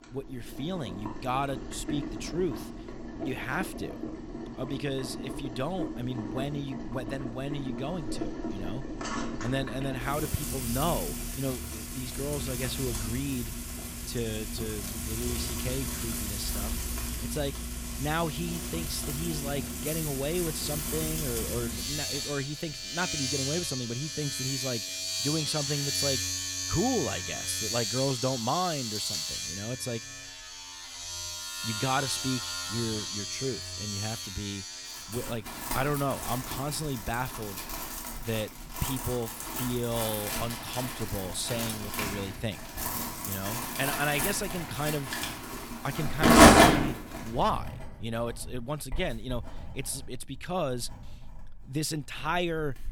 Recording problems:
household noises; very loud; throughout; 3 dB above the speech

